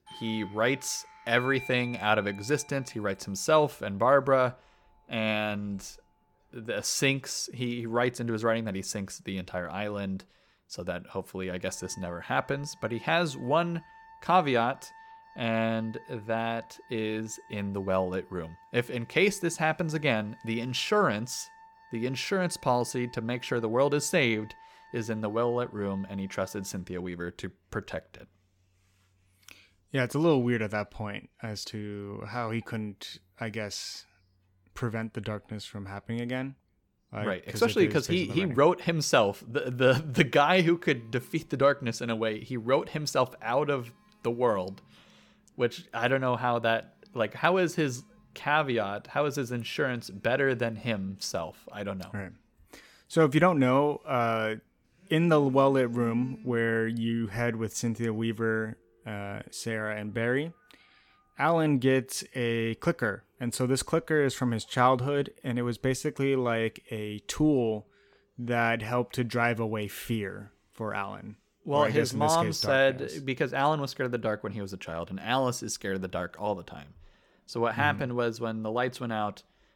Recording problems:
alarms or sirens; faint; throughout; 25 dB below the speech

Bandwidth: 17.5 kHz